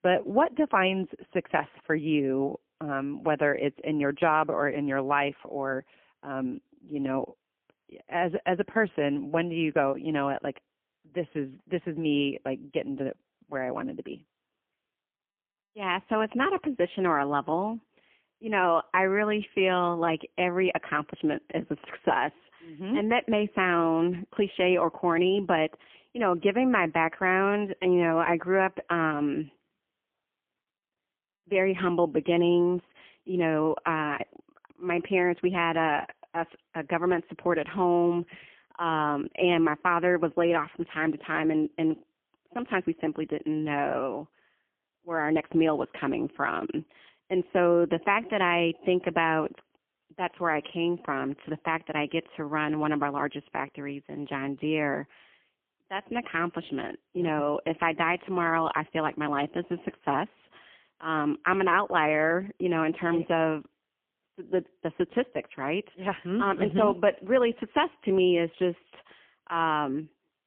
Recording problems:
phone-call audio; poor line; nothing above 3 kHz

